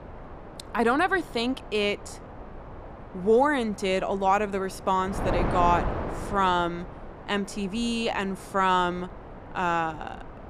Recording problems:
wind noise on the microphone; occasional gusts; 15 dB below the speech

